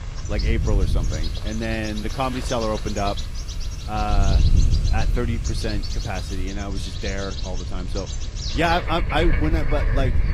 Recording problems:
garbled, watery; slightly; nothing above 14.5 kHz
animal sounds; loud; throughout; 8 dB below the speech
wind noise on the microphone; occasional gusts; 15 dB below the speech
hiss; faint; until 6.5 s; 20 dB below the speech

